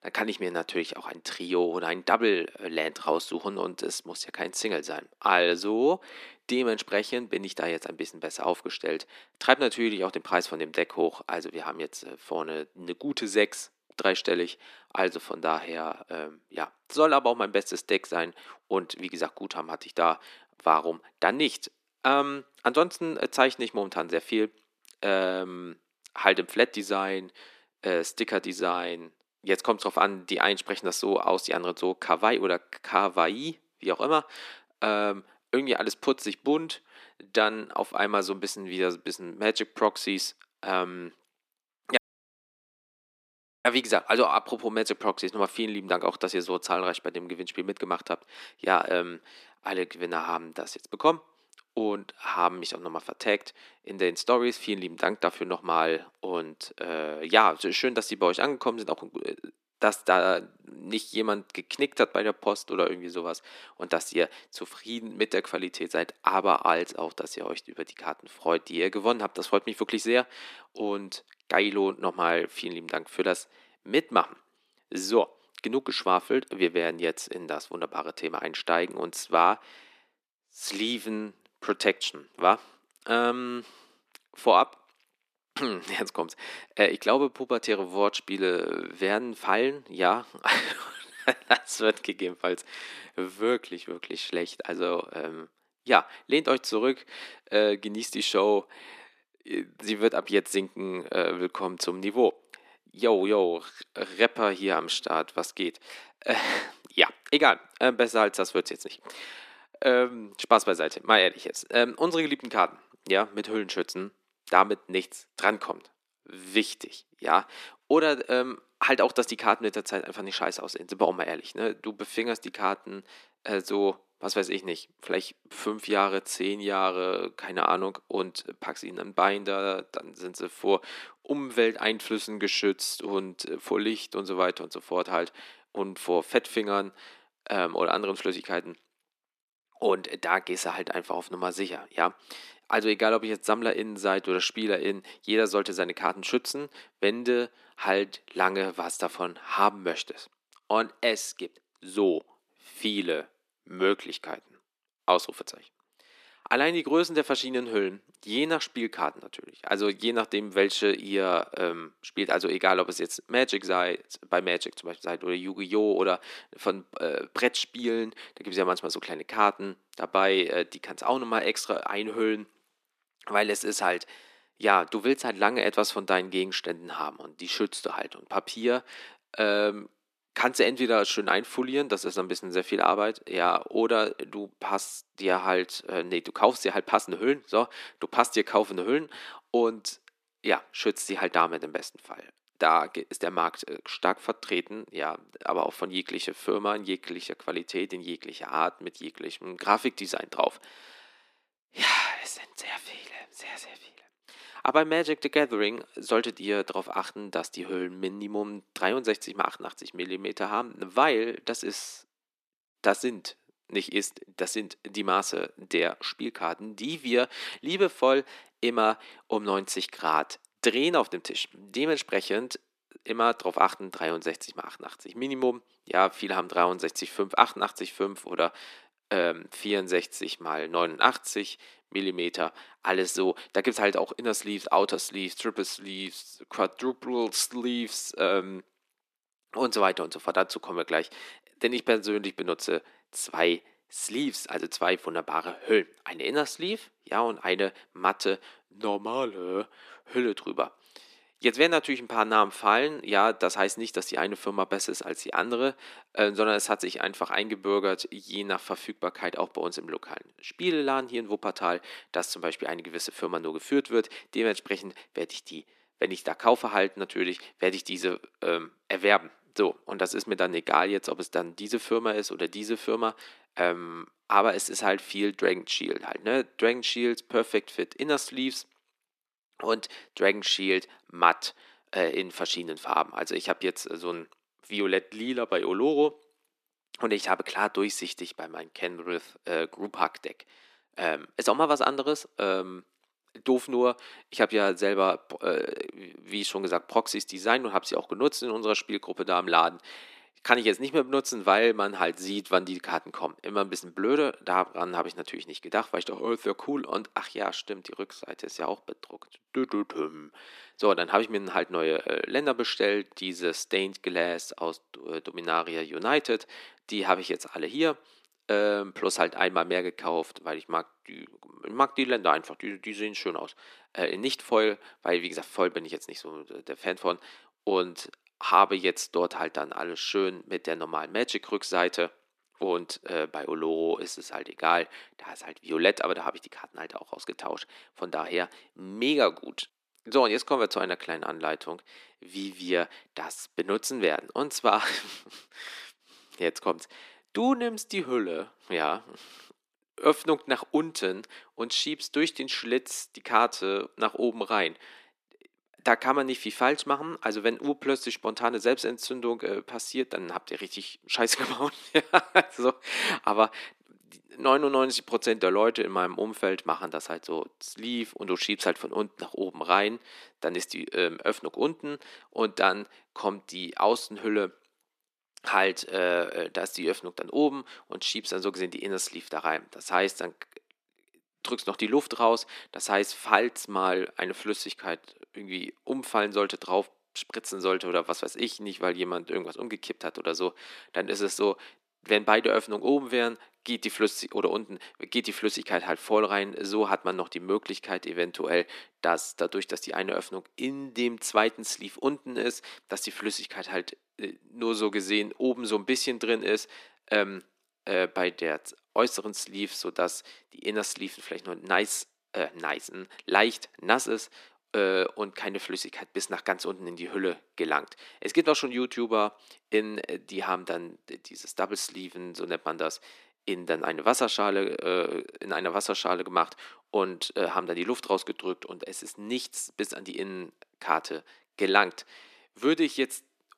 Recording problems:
thin; very; fading below 300 Hz
audio cutting out; at 42 s for 1.5 s

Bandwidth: 14.5 kHz